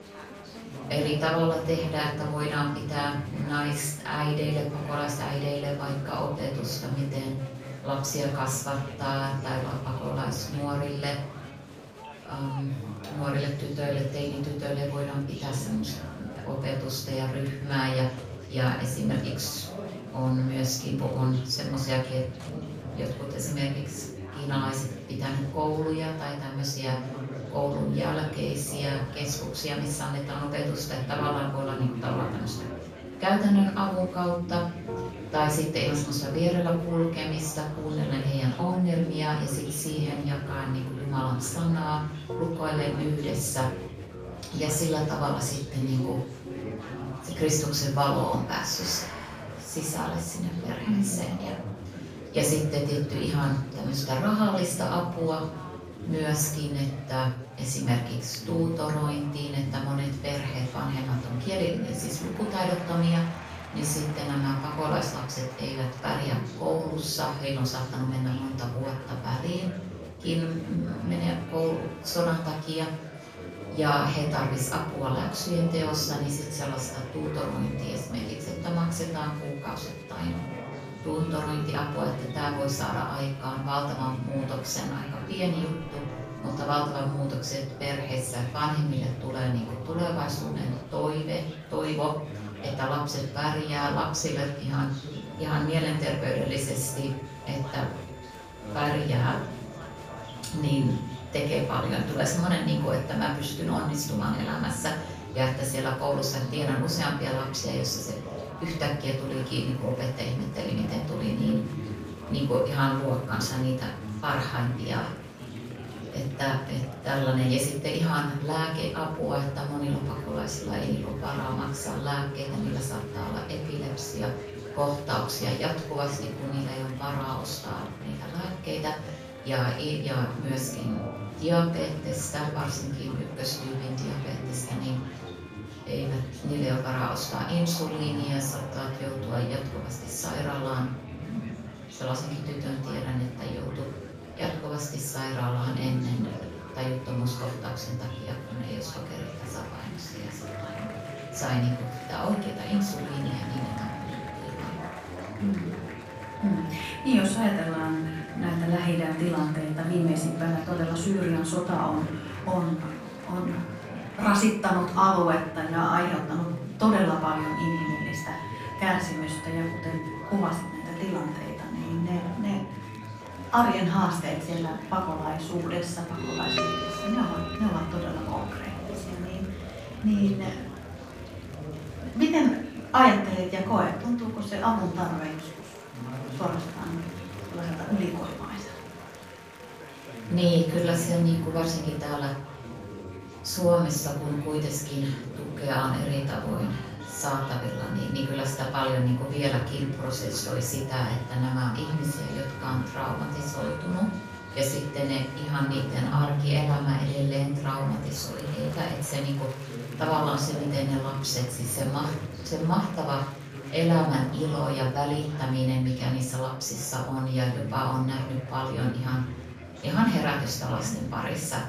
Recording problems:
off-mic speech; far
room echo; noticeable; dies away in 0.5 s
background music; noticeable; throughout; 15 dB below the speech
chatter from many people; noticeable; throughout; 10 dB below the speech

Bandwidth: 15 kHz